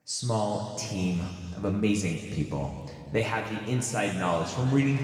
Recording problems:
room echo; noticeable; dies away in 2.2 s
off-mic speech; somewhat distant

